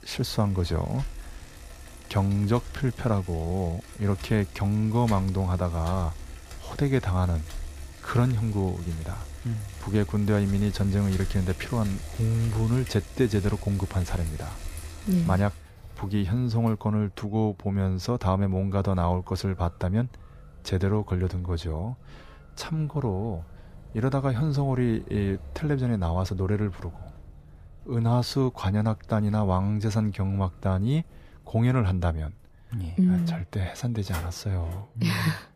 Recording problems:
traffic noise; noticeable; throughout; 15 dB below the speech

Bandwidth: 15 kHz